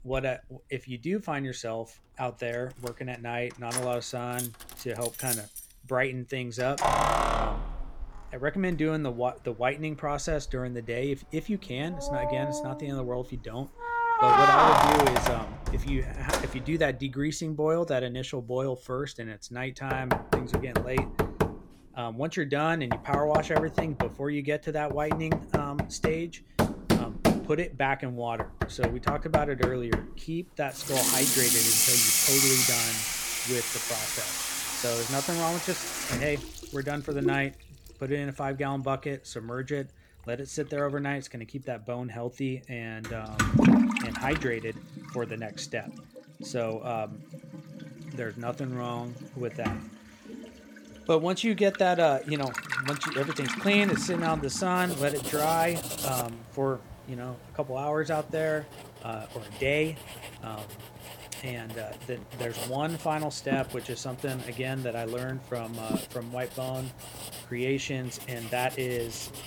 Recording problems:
household noises; very loud; throughout; 4 dB above the speech

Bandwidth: 18.5 kHz